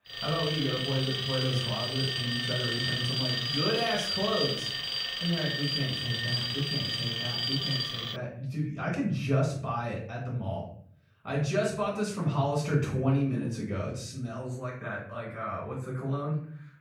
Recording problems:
off-mic speech; far
room echo; noticeable; dies away in 0.5 s
alarm; loud; until 8 s; peak 4 dB above the speech

